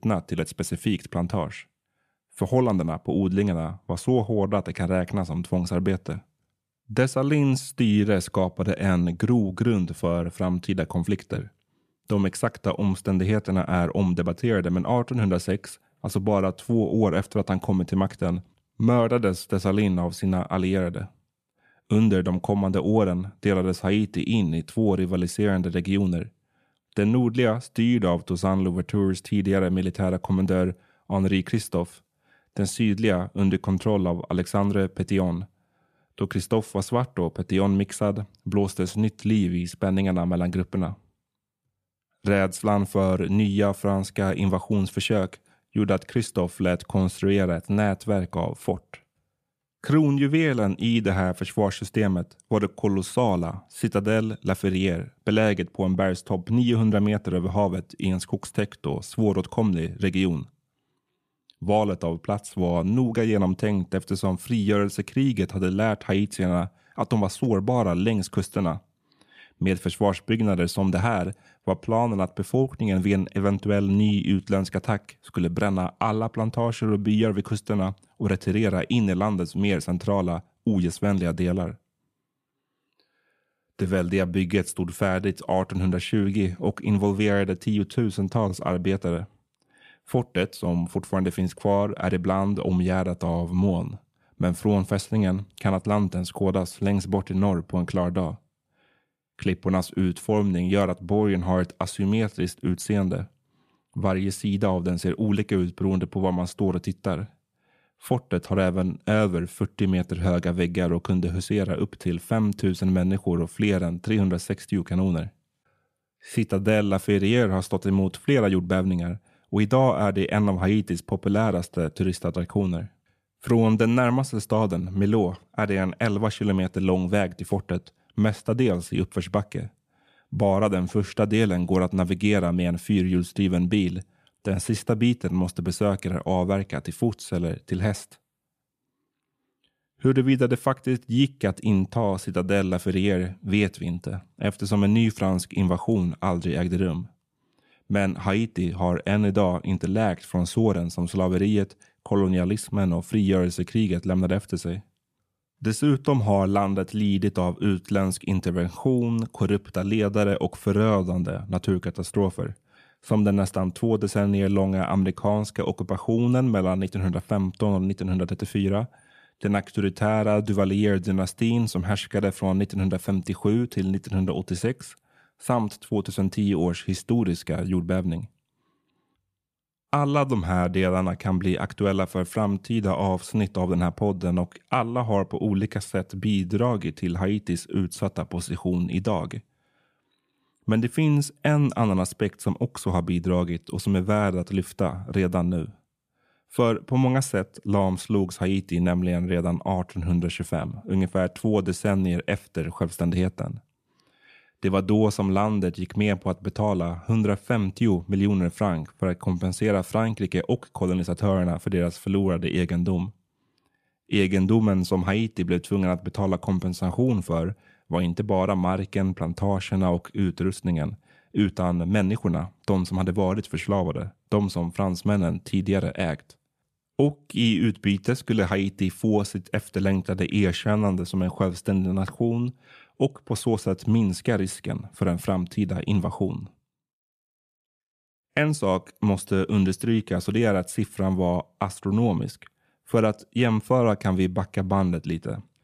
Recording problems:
none

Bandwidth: 14.5 kHz